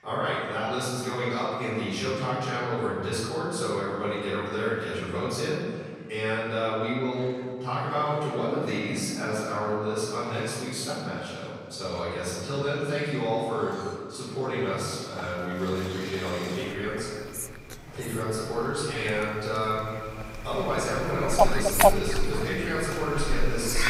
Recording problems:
room echo; strong; dies away in 1.9 s
off-mic speech; far
animal sounds; very faint; throughout; 1 dB below the speech

